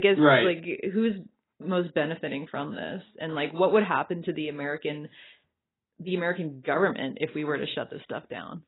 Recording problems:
garbled, watery; badly; nothing above 4 kHz
abrupt cut into speech; at the start

